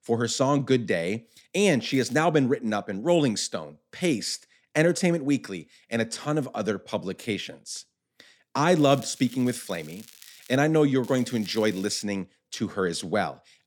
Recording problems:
crackling; faint; at 2 s, from 9 to 11 s and at 11 s; 25 dB below the speech

